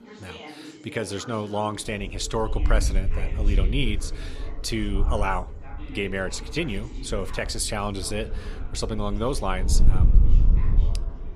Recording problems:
background chatter; noticeable; throughout; 4 voices, 15 dB below the speech
wind noise on the microphone; occasional gusts; from 2 s on; 15 dB below the speech

